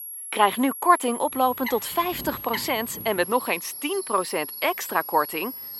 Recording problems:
thin; somewhat; fading below 350 Hz
high-pitched whine; loud; throughout; 11.5 kHz, 9 dB below the speech
animal sounds; noticeable; from 1.5 s on; 15 dB below the speech

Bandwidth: 16 kHz